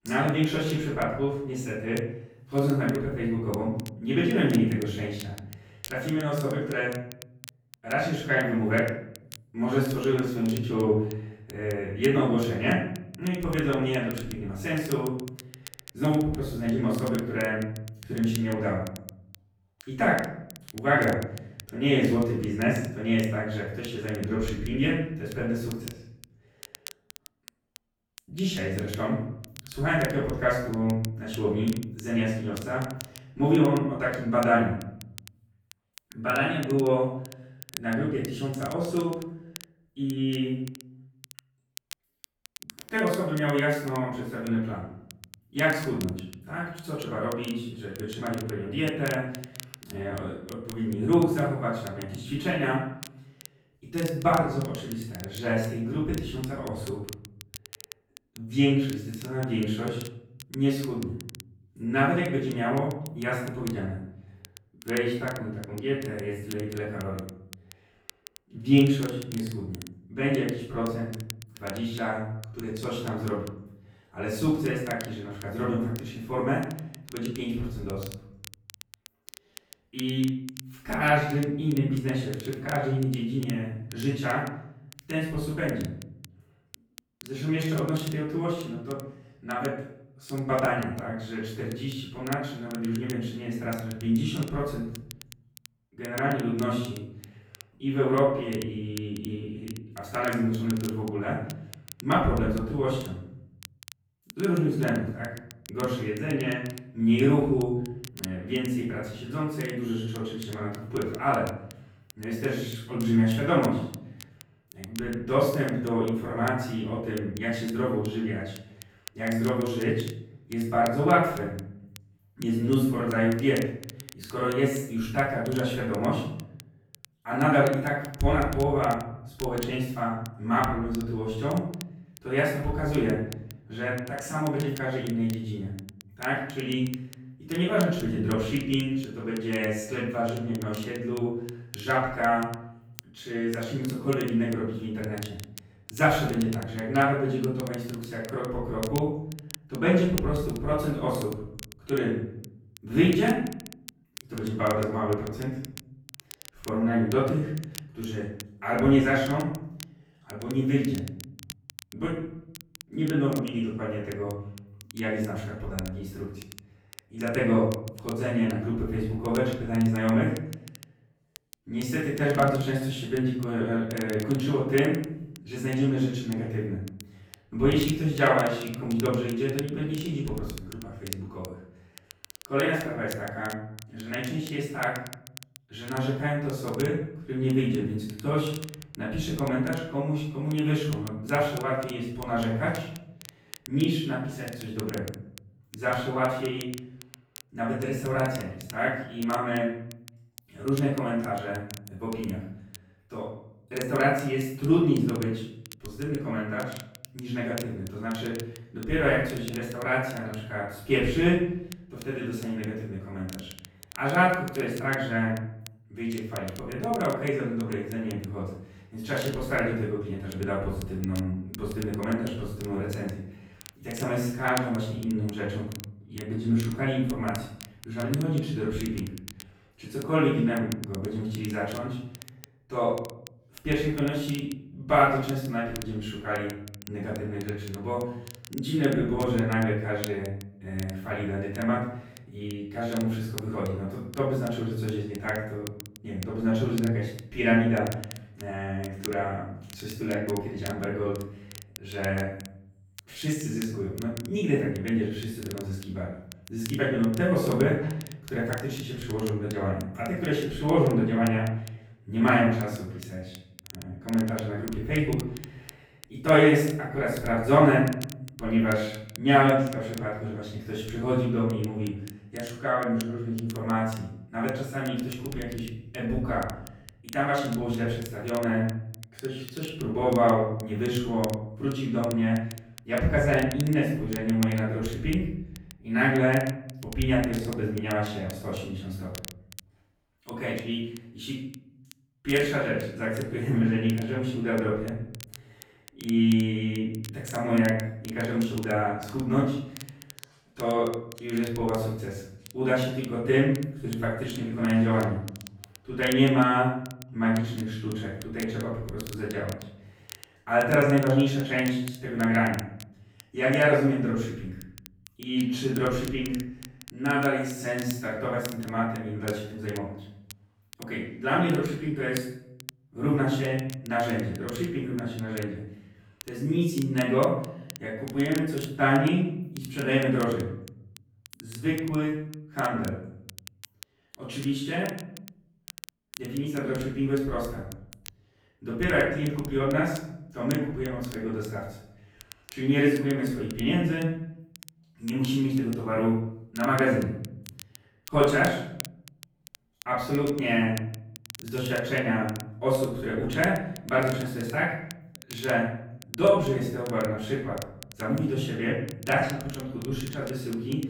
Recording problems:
off-mic speech; far
room echo; noticeable; dies away in 0.7 s
crackle, like an old record; noticeable; 20 dB below the speech

